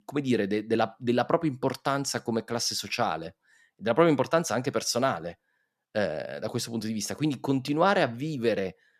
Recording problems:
none

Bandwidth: 14.5 kHz